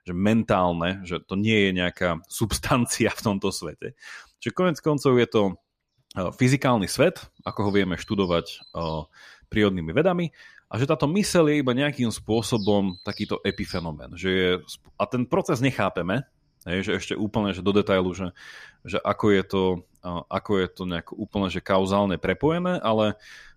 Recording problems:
animal sounds; noticeable; throughout; 20 dB below the speech

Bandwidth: 14.5 kHz